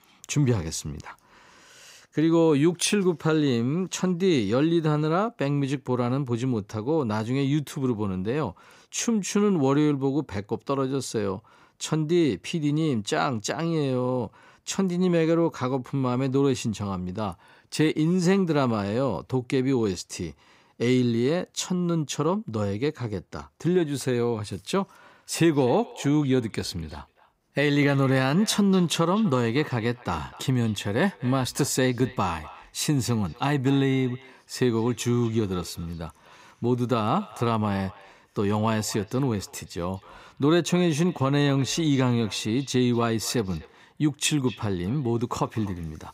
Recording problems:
echo of what is said; faint; from 25 s on; 250 ms later, 20 dB below the speech

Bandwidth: 15.5 kHz